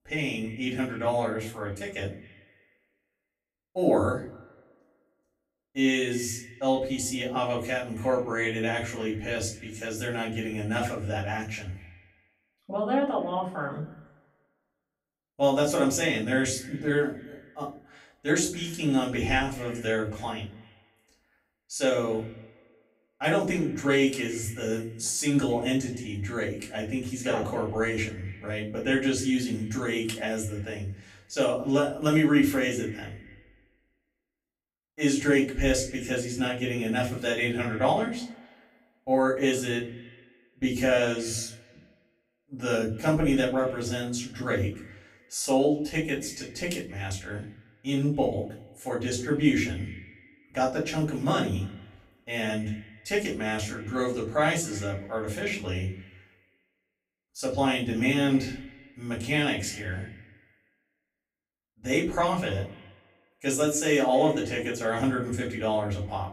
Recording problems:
off-mic speech; far
echo of what is said; faint; throughout; 260 ms later, 20 dB below the speech
room echo; slight; dies away in 0.4 s

